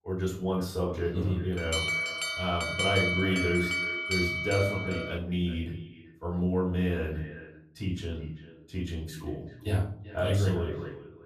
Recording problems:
off-mic speech; far
echo of what is said; noticeable; throughout; 390 ms later, 15 dB below the speech
room echo; slight; dies away in 0.5 s
alarm; loud; from 1.5 to 5 s; peak 5 dB above the speech

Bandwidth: 14.5 kHz